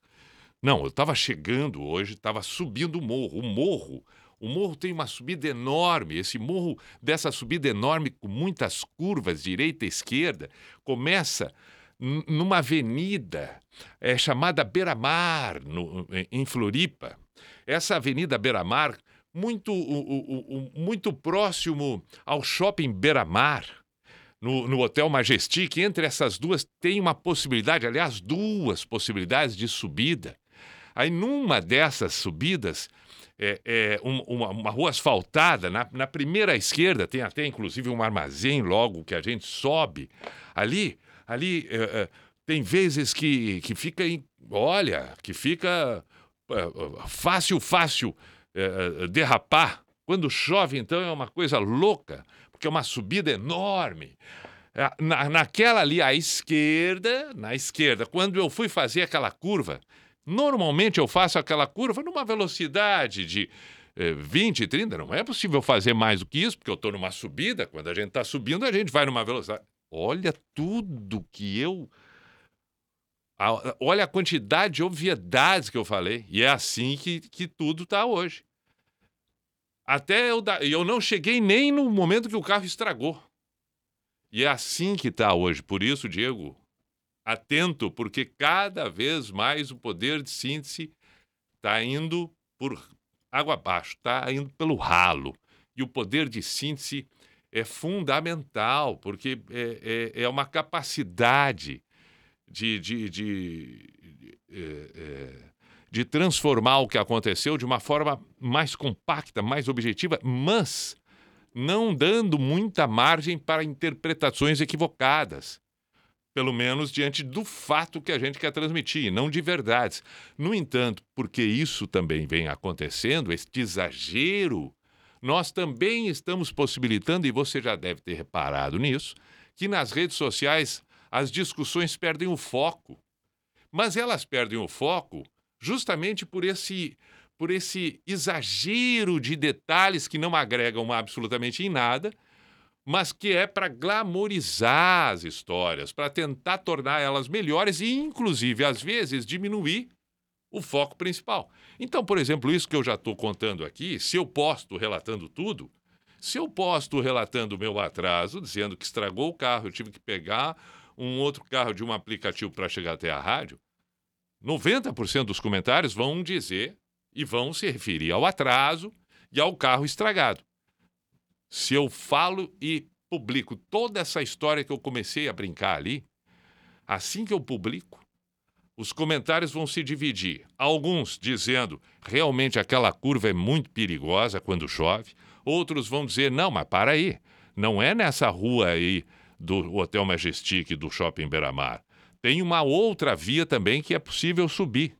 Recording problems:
none

